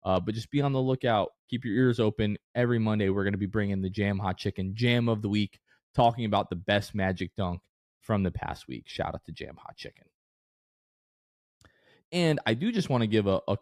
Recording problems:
none

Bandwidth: 14.5 kHz